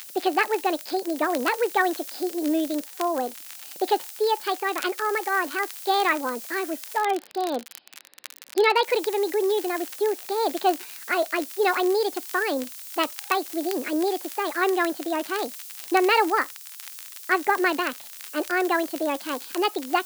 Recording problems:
wrong speed and pitch; too fast and too high; 1.5 times normal speed
high frequencies cut off; noticeable; nothing above 5.5 kHz
hiss; noticeable; until 7 s and from 9 s on; 15 dB below the speech
crackle, like an old record; noticeable; 15 dB below the speech

